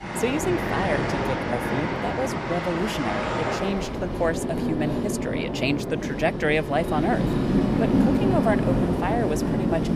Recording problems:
train or aircraft noise; very loud; throughout; 2 dB above the speech

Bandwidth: 15 kHz